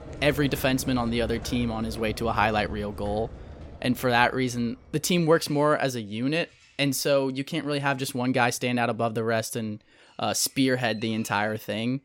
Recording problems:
animal sounds; noticeable; throughout; 15 dB below the speech

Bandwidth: 16.5 kHz